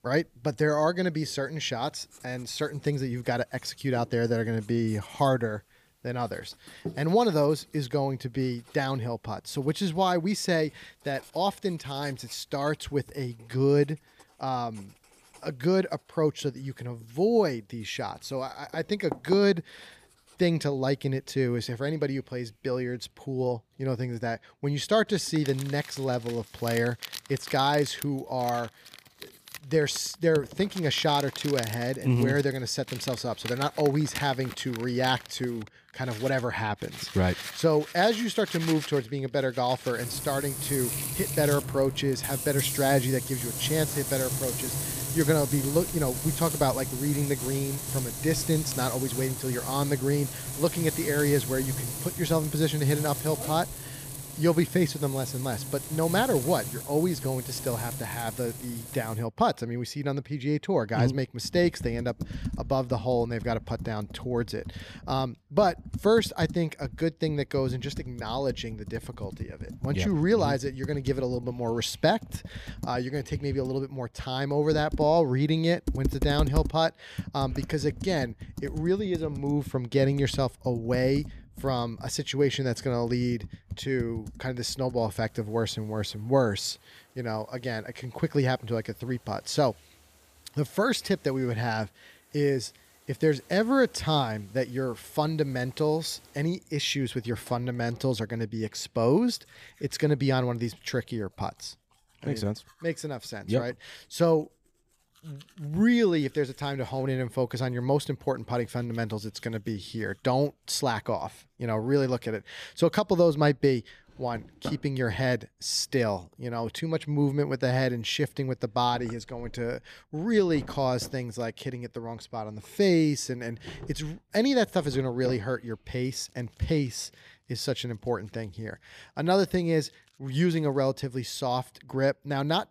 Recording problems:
household noises; loud; throughout; 8 dB below the speech

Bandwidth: 15 kHz